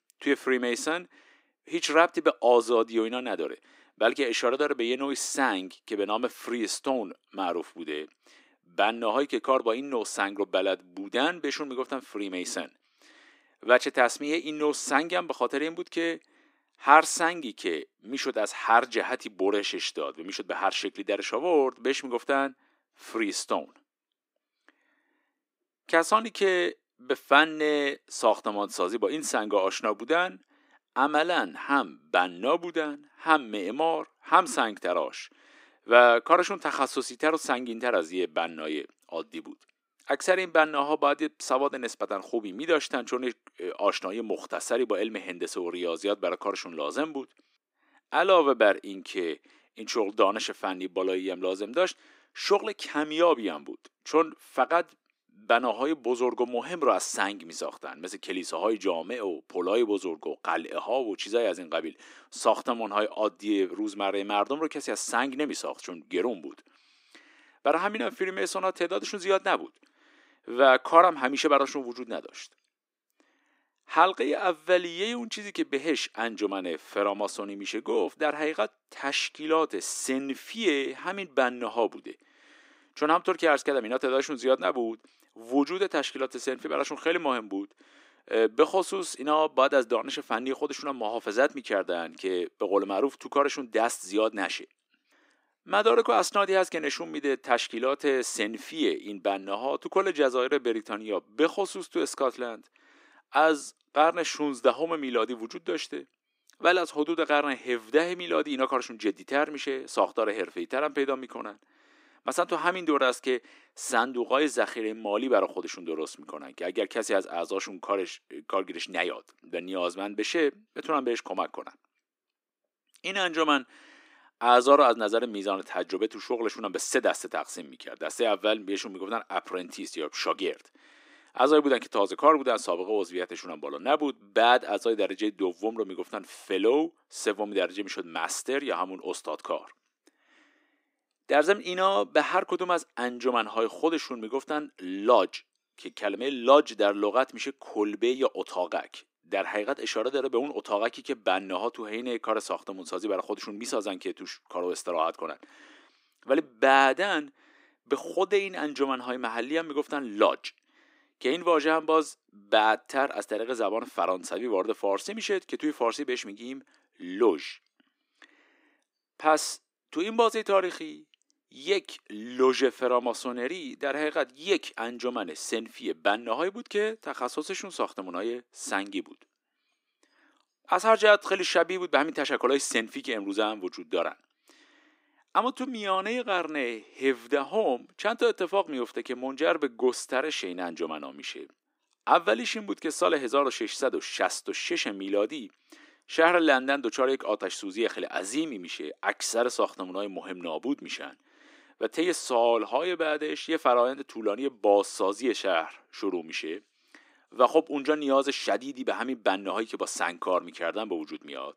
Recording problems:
thin; somewhat; fading below 300 Hz

